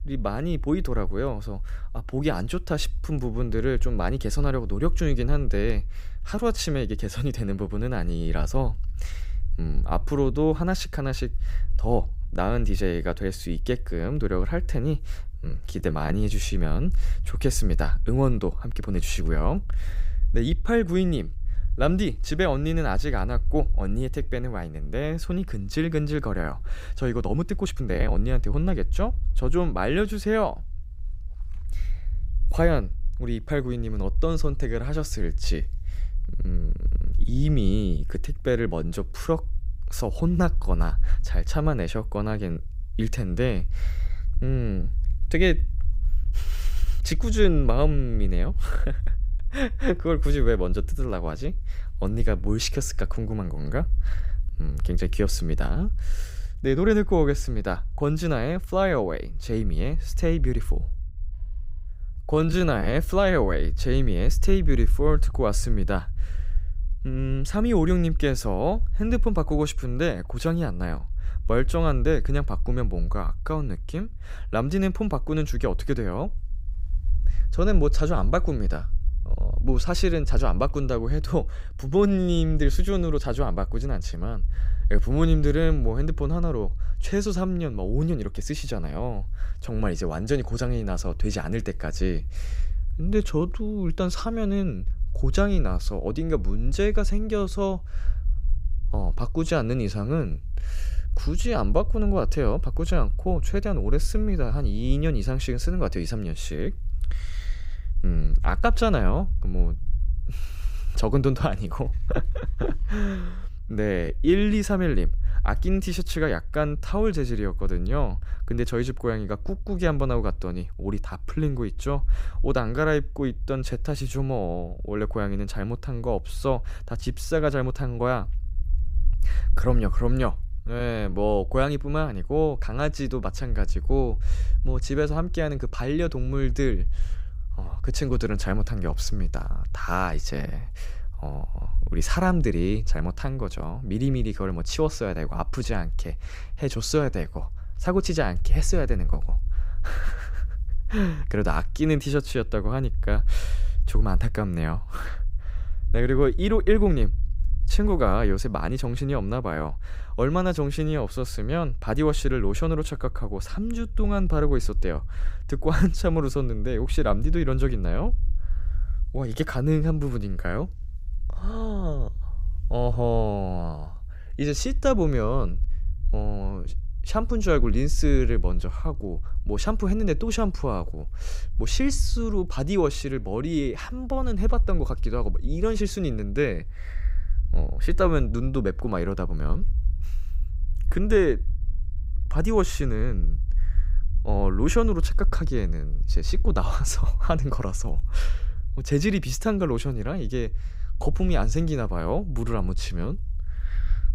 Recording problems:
low rumble; faint; throughout; 25 dB below the speech
uneven, jittery; strongly; from 15 s to 2:11

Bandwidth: 15.5 kHz